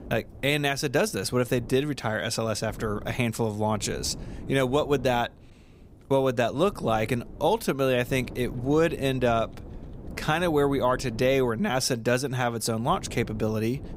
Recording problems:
wind noise on the microphone; occasional gusts; 25 dB below the speech

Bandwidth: 15.5 kHz